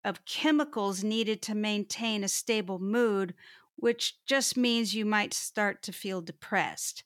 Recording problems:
none

